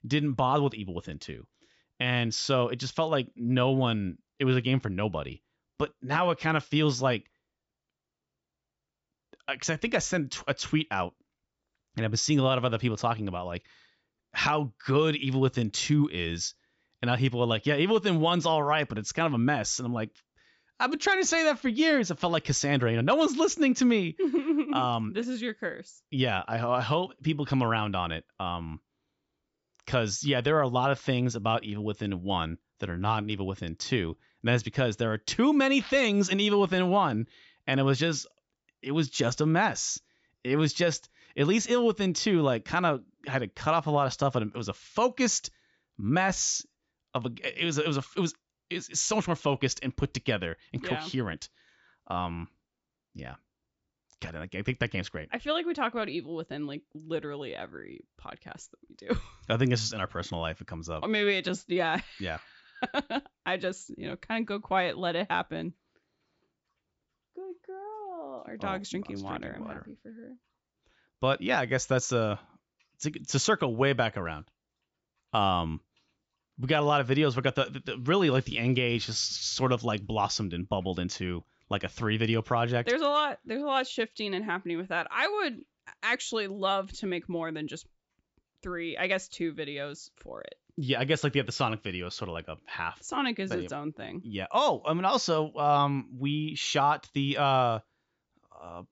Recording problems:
high frequencies cut off; noticeable; nothing above 8 kHz

